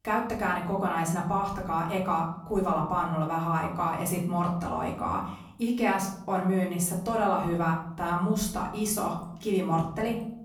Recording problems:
off-mic speech; far
room echo; slight; dies away in 0.7 s

